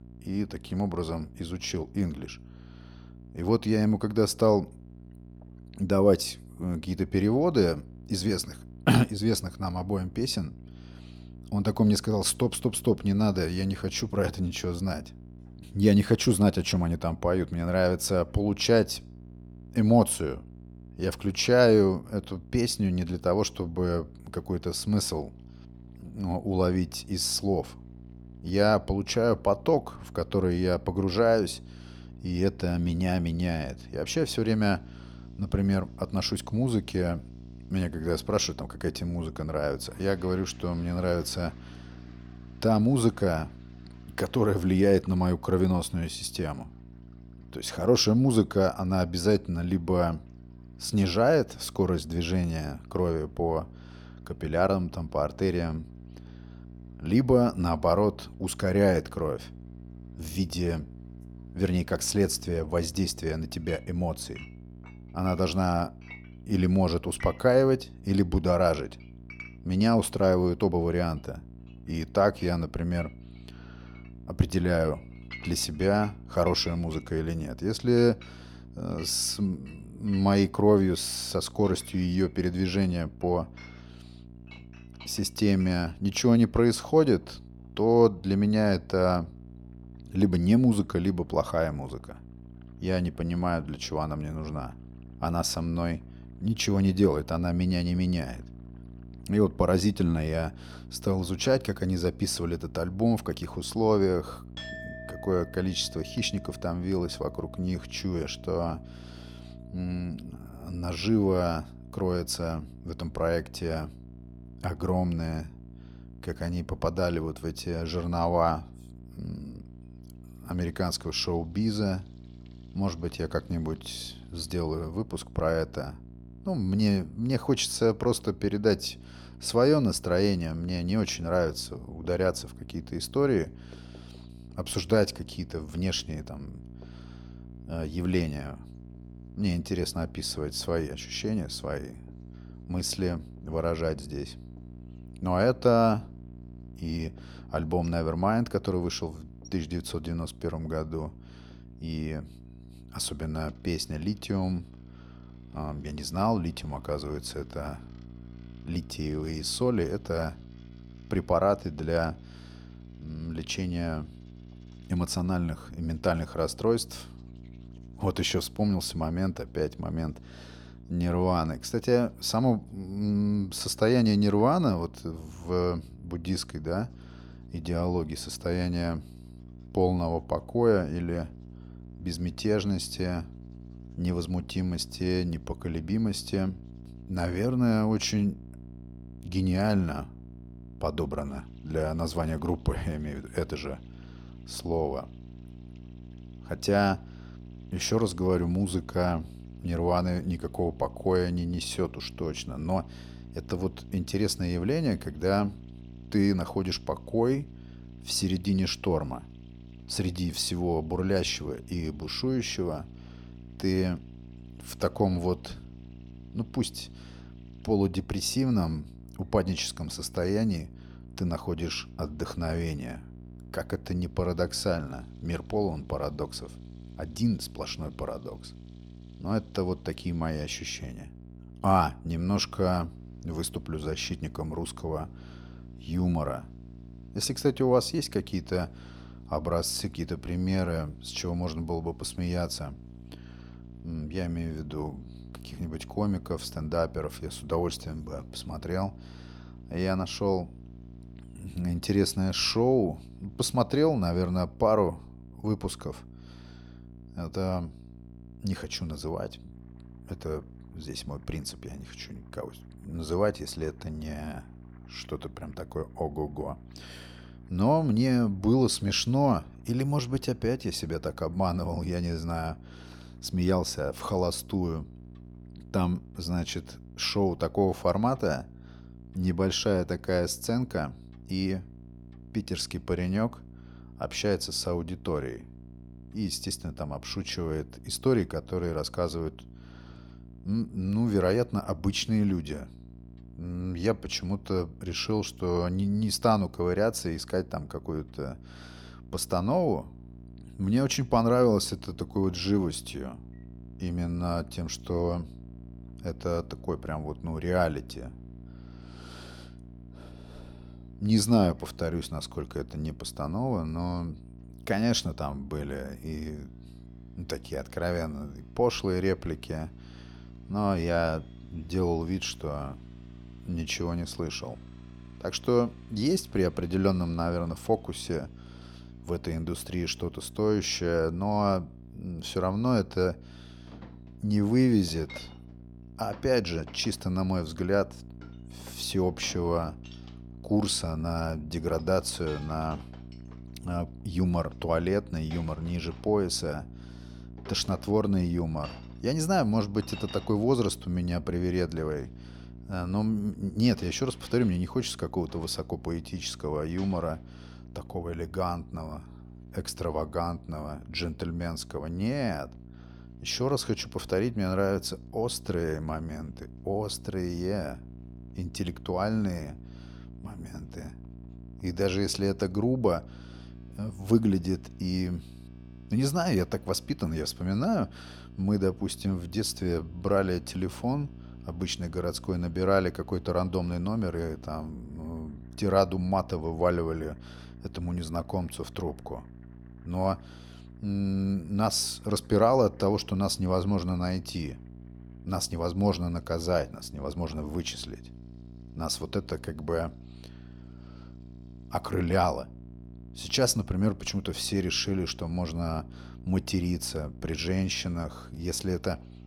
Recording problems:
electrical hum; faint; throughout; 60 Hz, 25 dB below the speech
household noises; faint; throughout; 25 dB below the speech

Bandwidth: 19 kHz